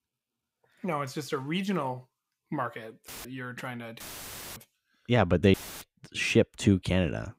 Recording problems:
audio cutting out; filled with static; at 3 s, at 4 s for 0.5 s and at 5.5 s

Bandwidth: 15.5 kHz